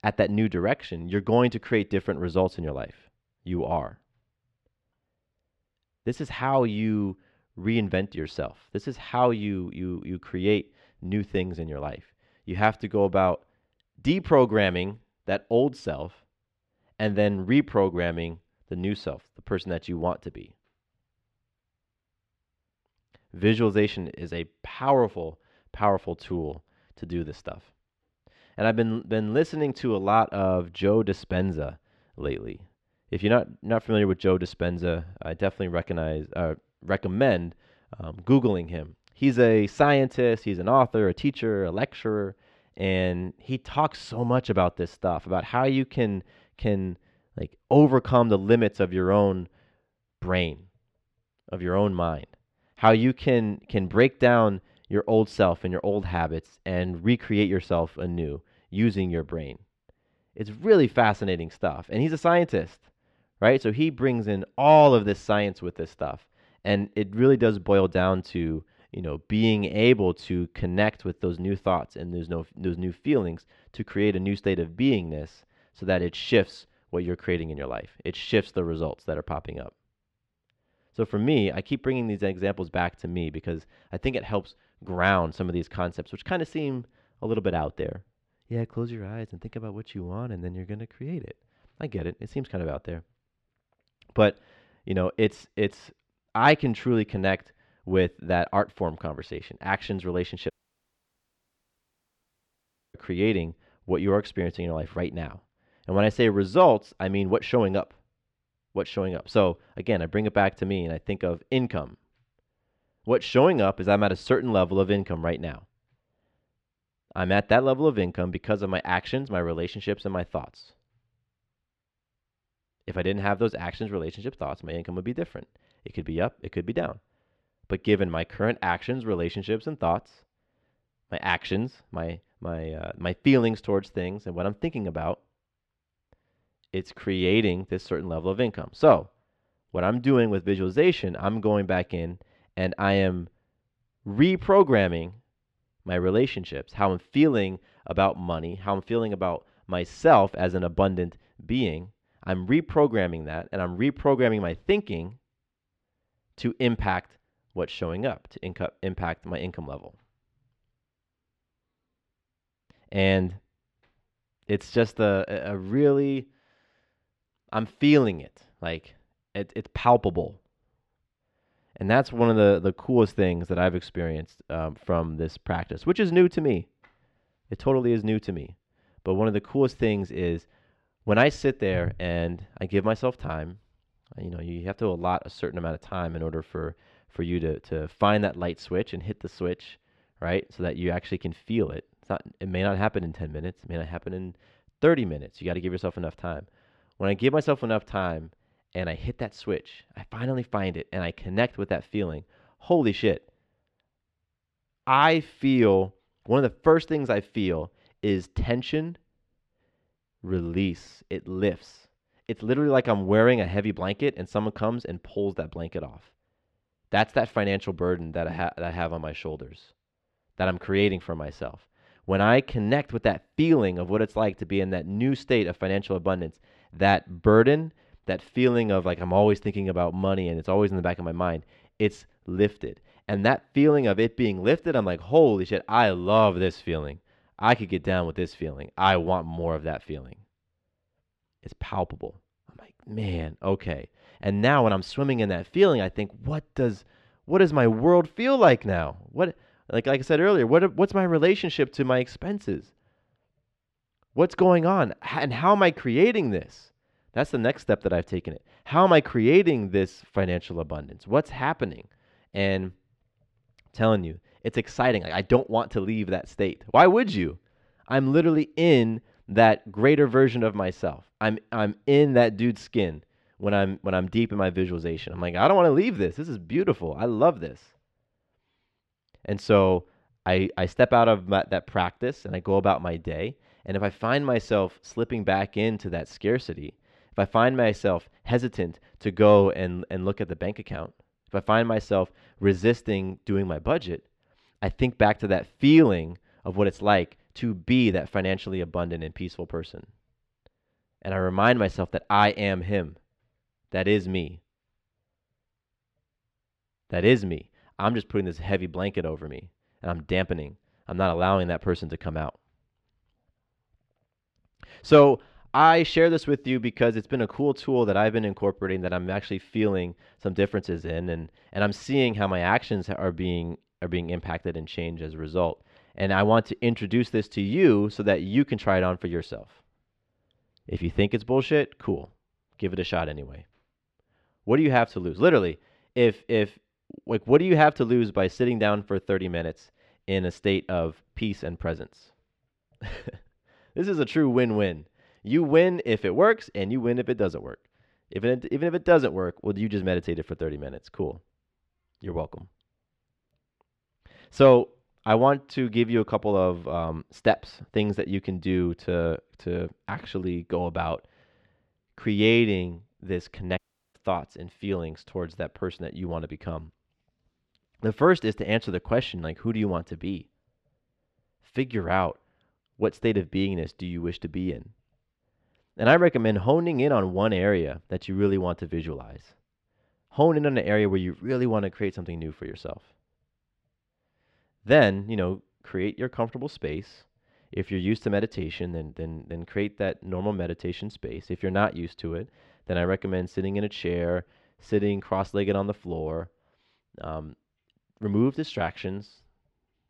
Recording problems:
muffled; slightly; fading above 2.5 kHz
audio cutting out; at 1:41 for 2.5 s and at 6:04

